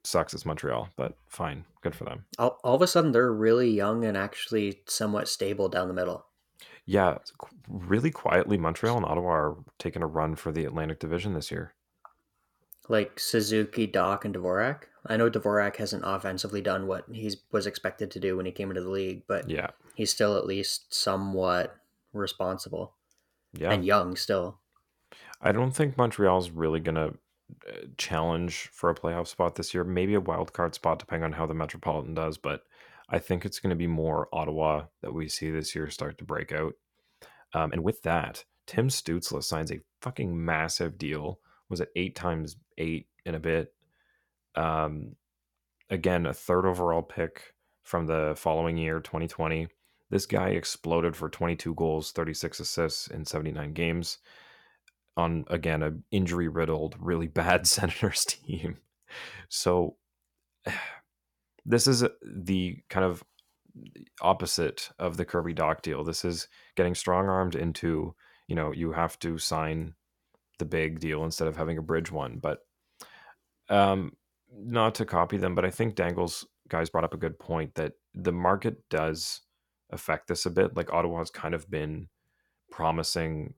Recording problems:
uneven, jittery; strongly; from 2.5 s to 1:17

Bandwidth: 18 kHz